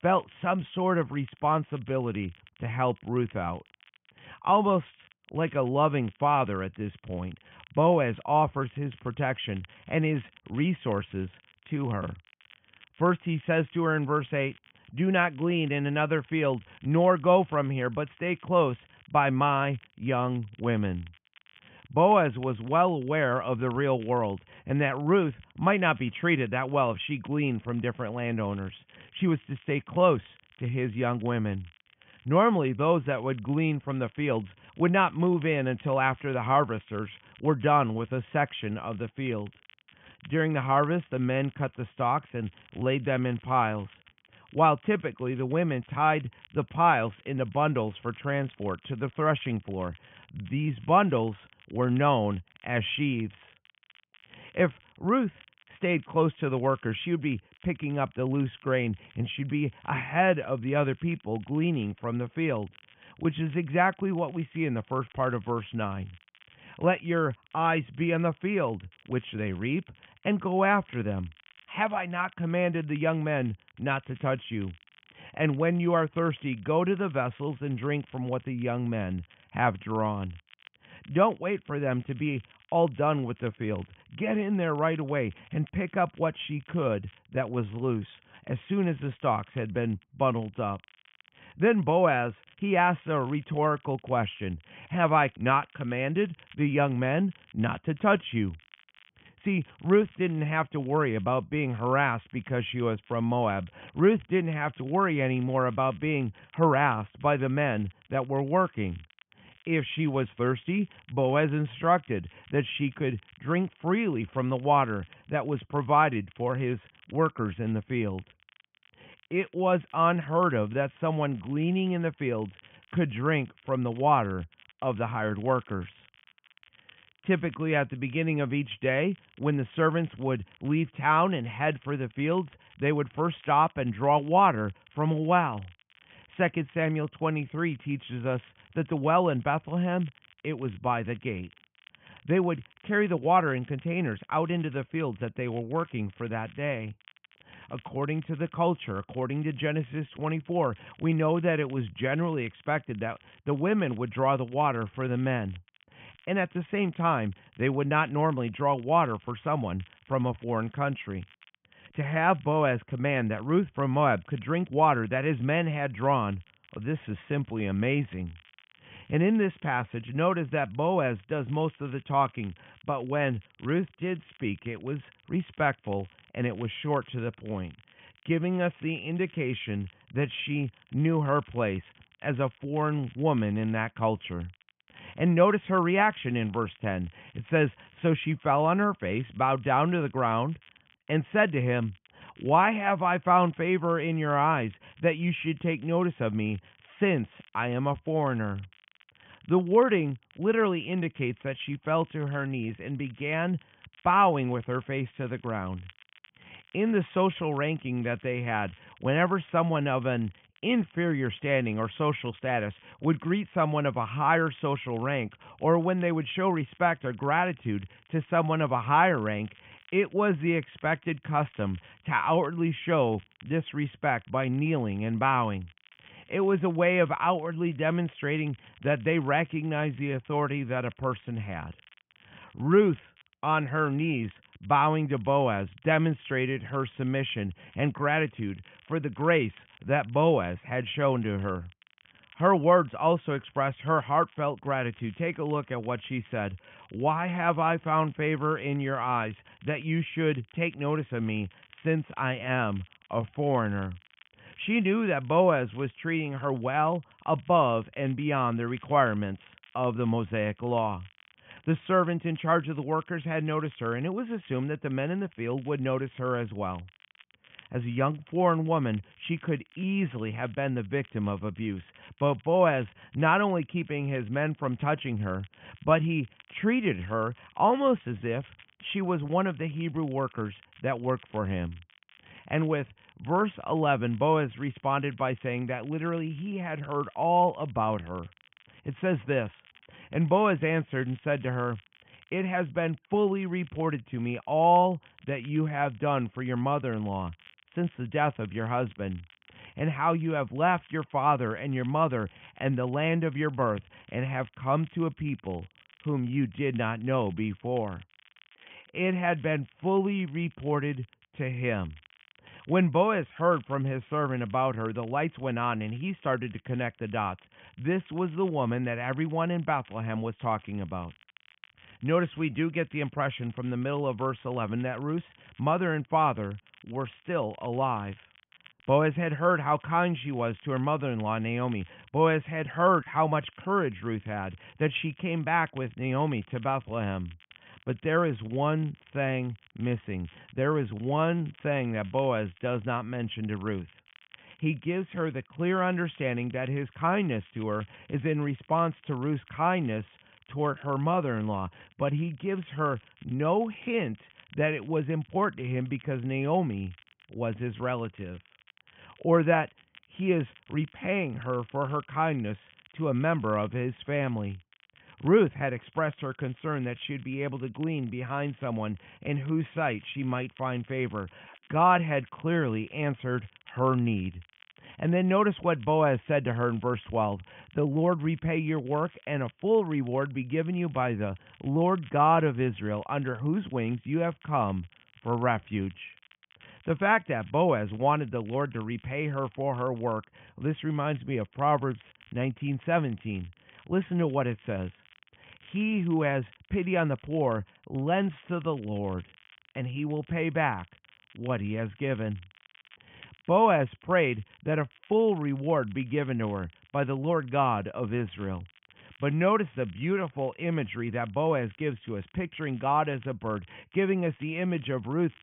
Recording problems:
high frequencies cut off; severe; nothing above 3.5 kHz
crackle, like an old record; faint; 30 dB below the speech

